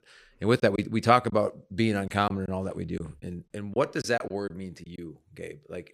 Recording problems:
choppy; very; at 0.5 s, at 2 s and from 3 to 5 s; 8% of the speech affected

